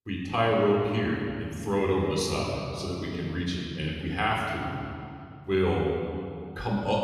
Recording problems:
off-mic speech; far
room echo; noticeable; dies away in 2.2 s

